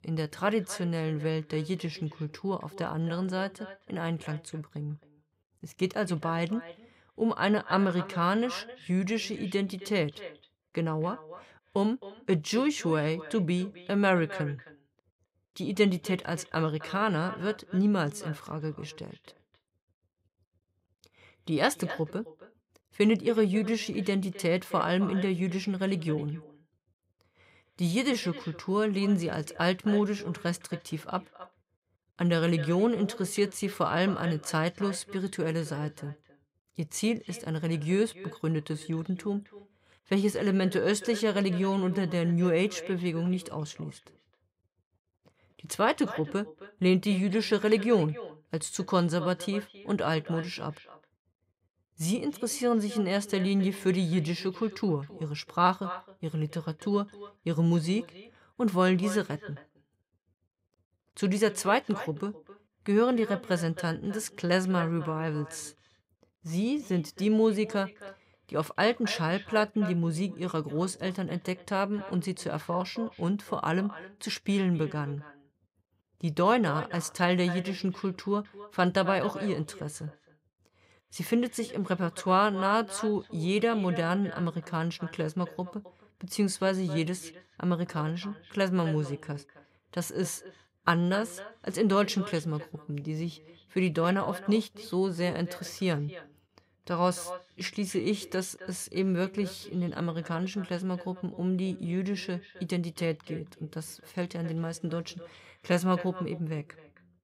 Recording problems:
echo of what is said; noticeable; throughout; 260 ms later, 15 dB below the speech

